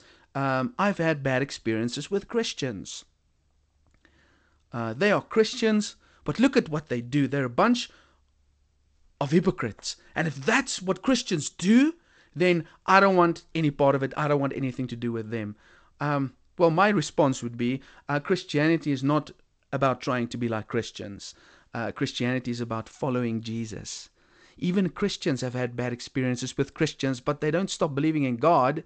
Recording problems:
garbled, watery; slightly; nothing above 8 kHz

